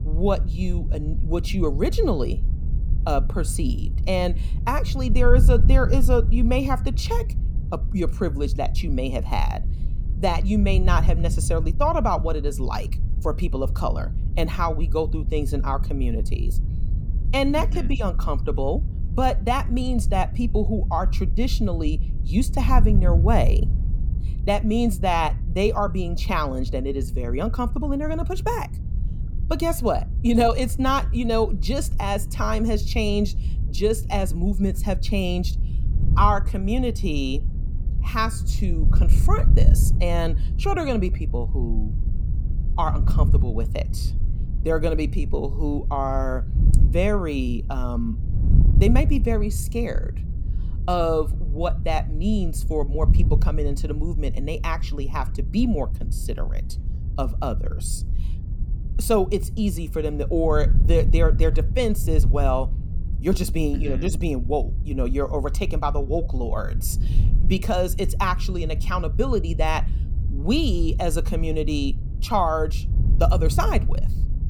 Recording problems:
wind noise on the microphone; occasional gusts; 15 dB below the speech

